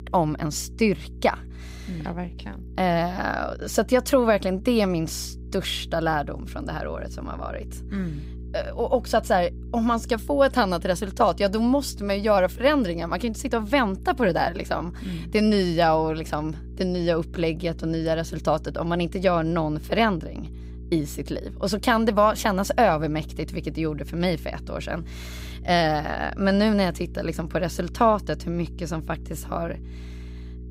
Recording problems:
electrical hum; faint; throughout; 60 Hz, 25 dB below the speech

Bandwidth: 15.5 kHz